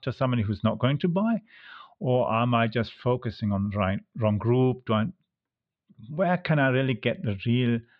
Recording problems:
muffled; slightly; fading above 4 kHz

